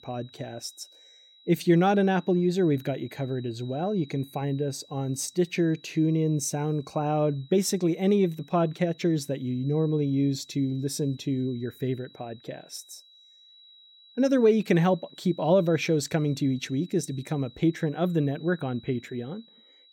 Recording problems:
high-pitched whine; faint; throughout; 4 kHz, 25 dB below the speech

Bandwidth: 16.5 kHz